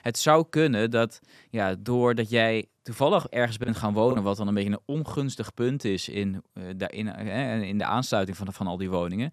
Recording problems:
choppy; occasionally; at 3.5 s; 5% of the speech affected

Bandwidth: 14 kHz